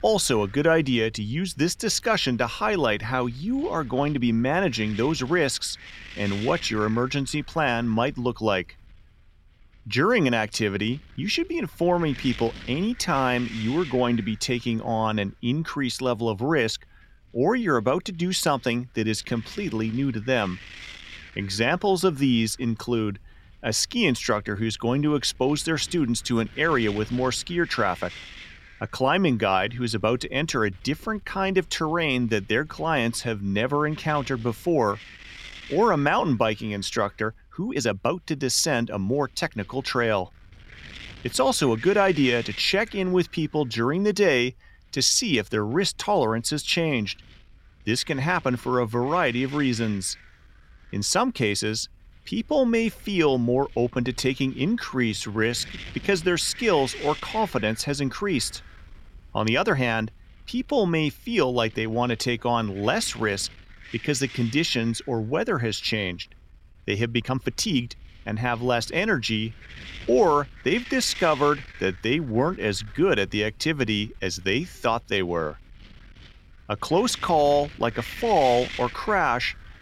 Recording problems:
wind noise on the microphone; occasional gusts; 15 dB below the speech
uneven, jittery; strongly; from 37 s to 1:08

